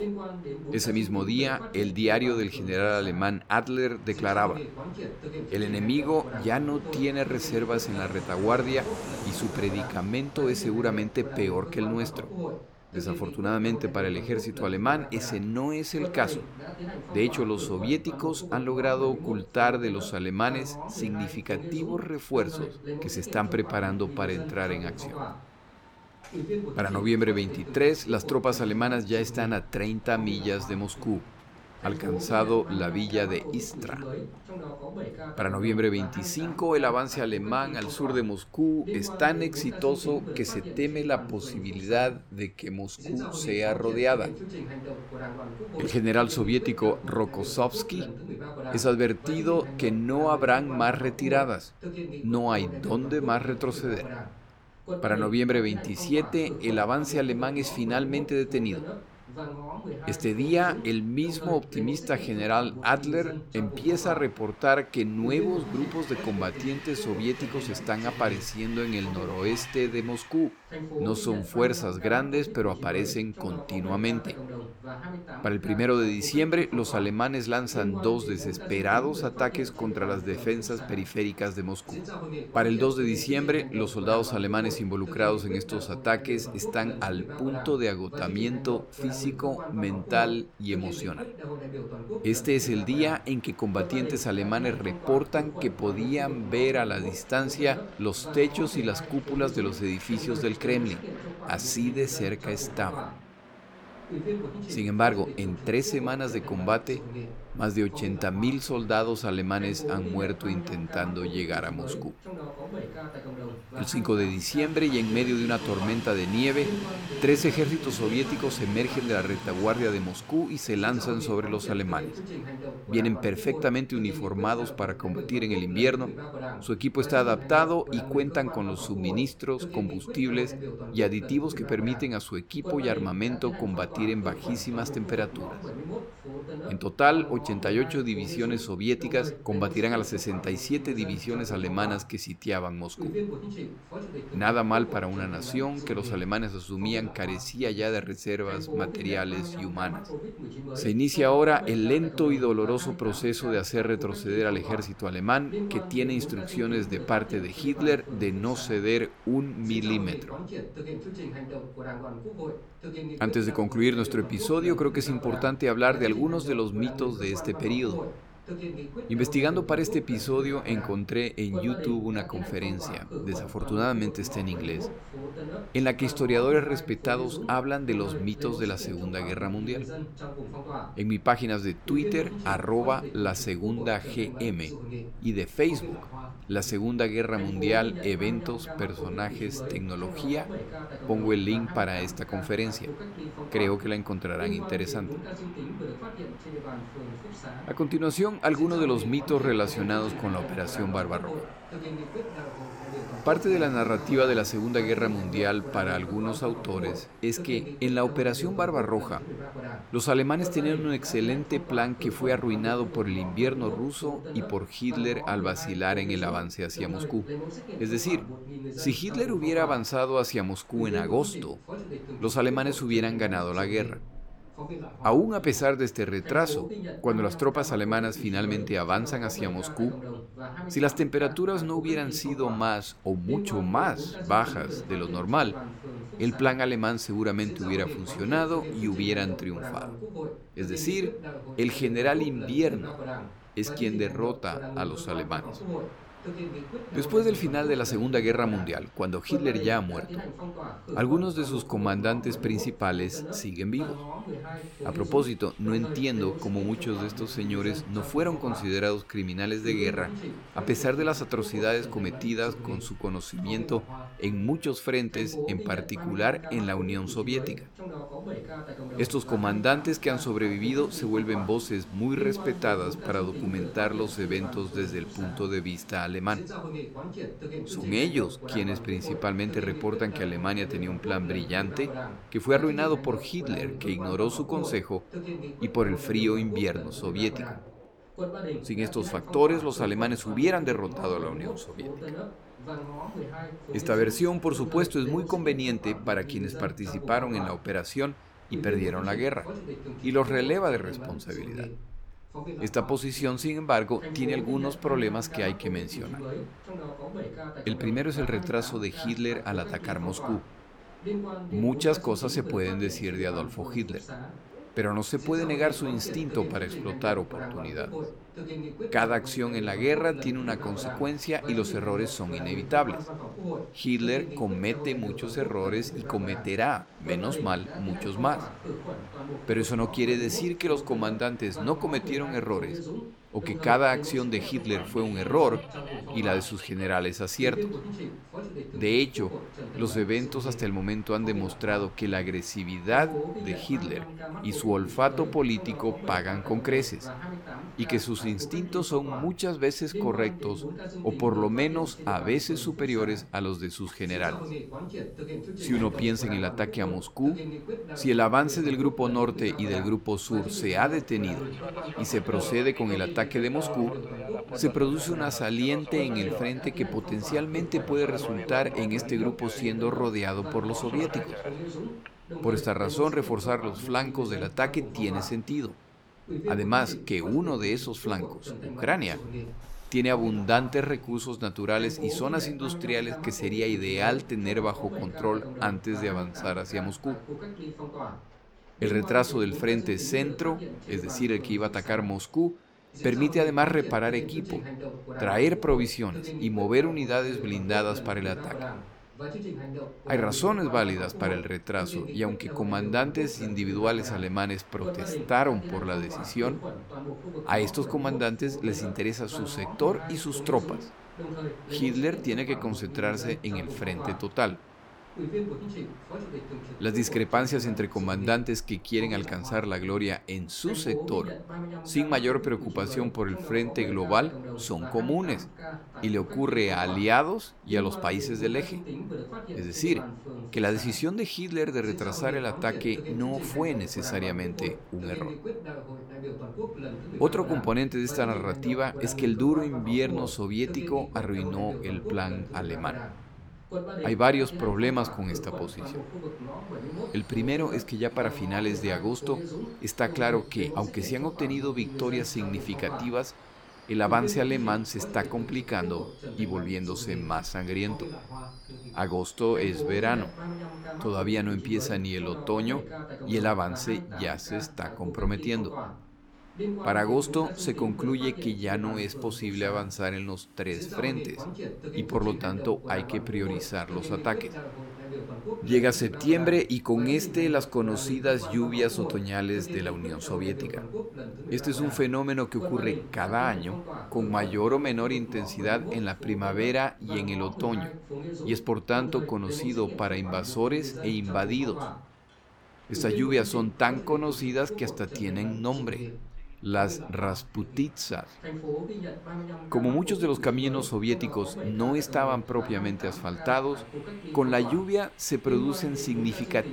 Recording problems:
voice in the background; loud; throughout; 10 dB below the speech
train or aircraft noise; faint; throughout; 20 dB below the speech

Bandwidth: 18 kHz